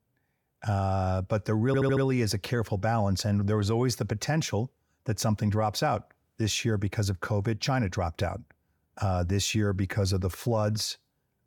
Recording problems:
audio stuttering; at 1.5 s

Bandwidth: 18 kHz